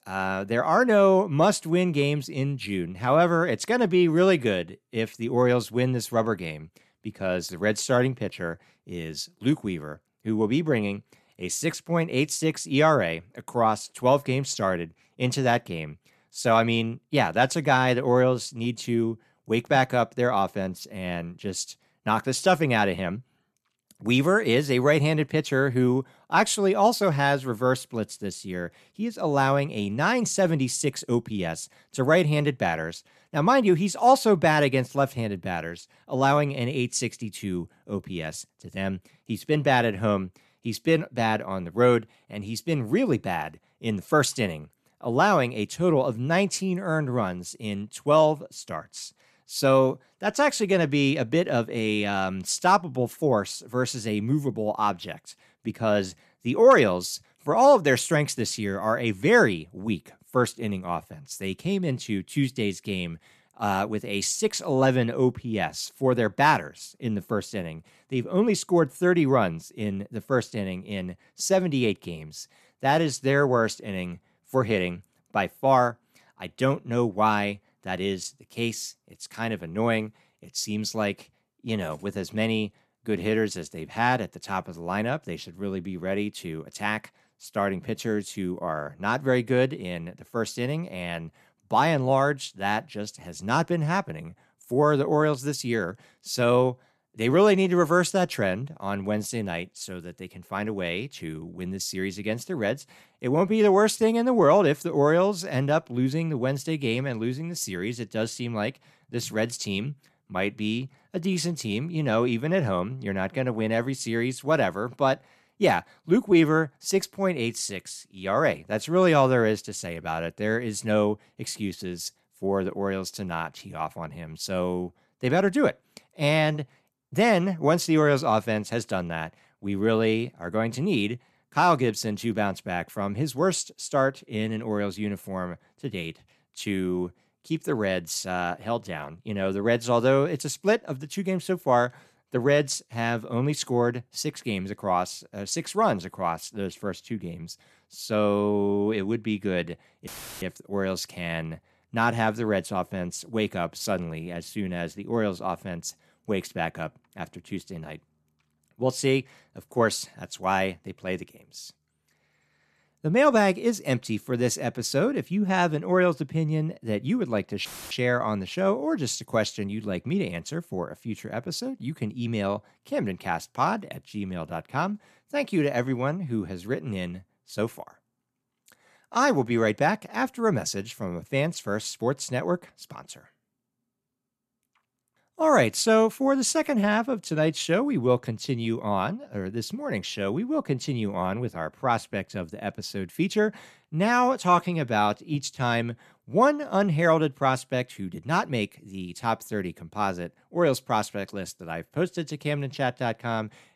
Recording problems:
audio cutting out; filled with static; at 2:30 and at 2:48

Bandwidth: 14 kHz